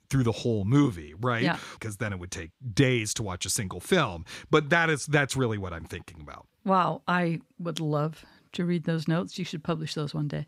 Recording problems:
none

